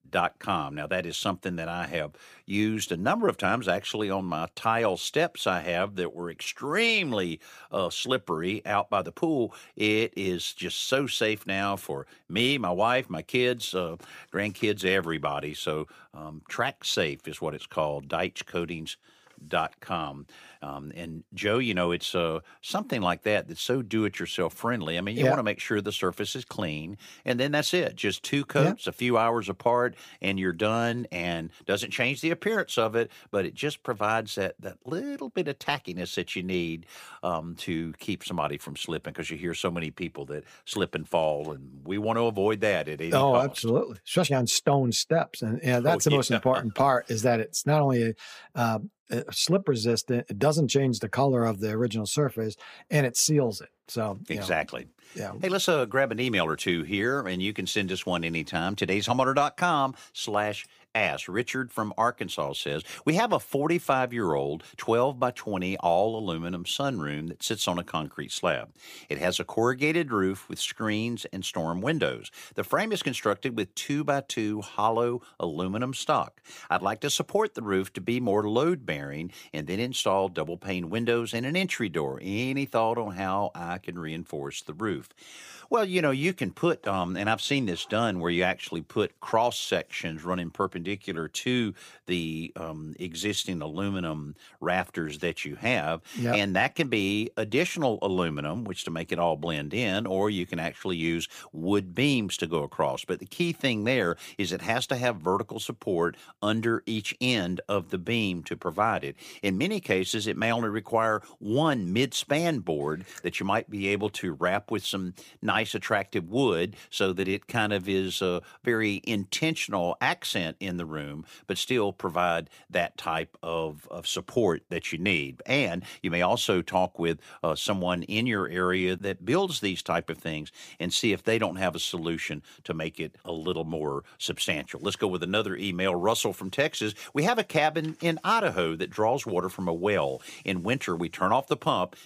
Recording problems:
none

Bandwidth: 15 kHz